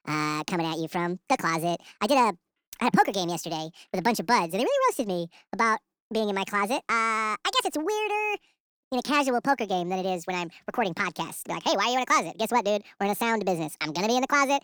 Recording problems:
wrong speed and pitch; too fast and too high; 1.7 times normal speed

